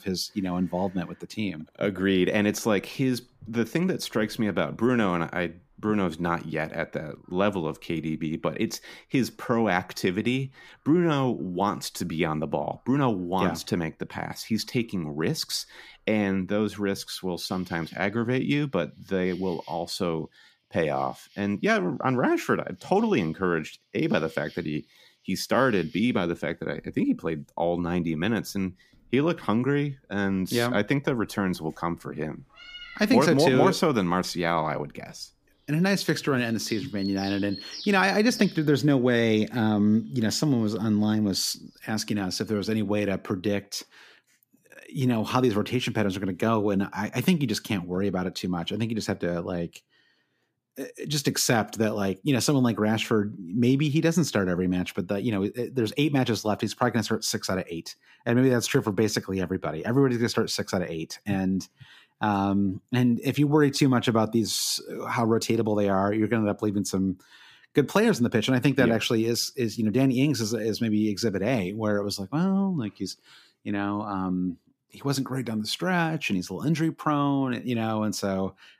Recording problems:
animal sounds; noticeable; until 42 s; 20 dB below the speech

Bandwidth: 15 kHz